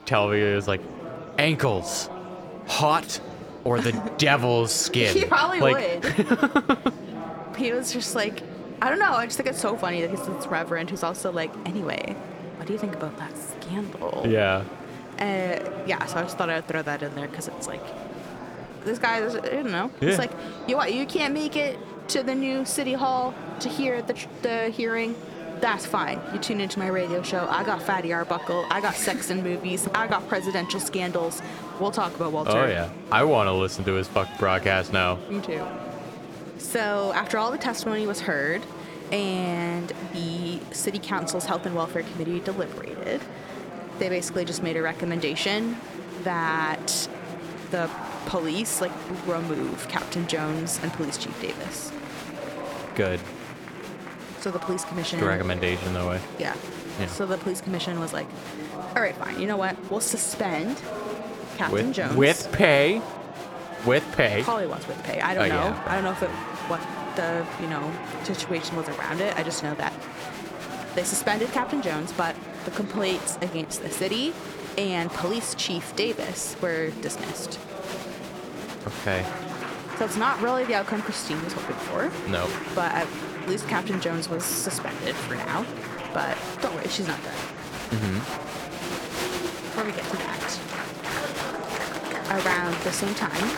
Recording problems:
murmuring crowd; loud; throughout; 9 dB below the speech

